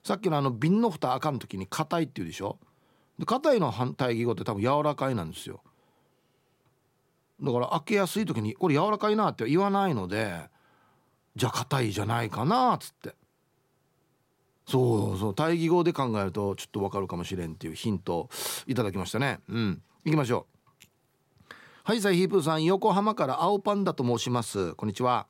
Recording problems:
none

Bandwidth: 16 kHz